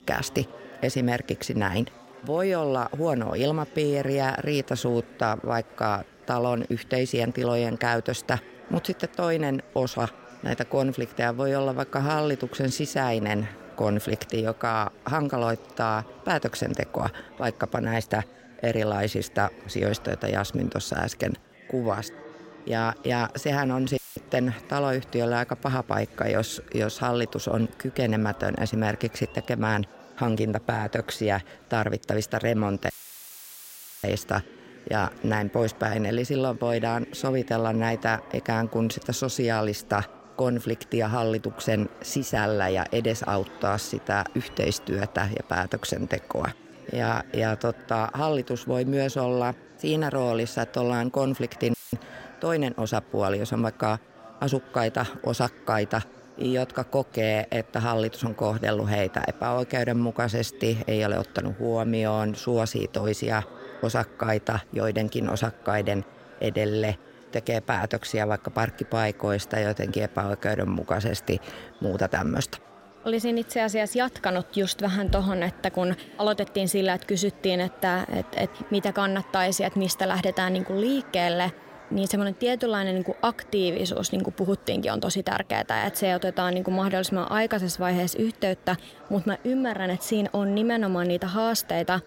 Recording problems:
murmuring crowd; faint; throughout; 20 dB below the speech
audio cutting out; filled with static; at 24 s, at 33 s for 1 s and at 52 s

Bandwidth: 16 kHz